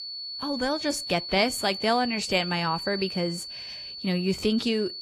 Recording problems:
garbled, watery; slightly
high-pitched whine; loud; throughout; 4.5 kHz, 7 dB below the speech

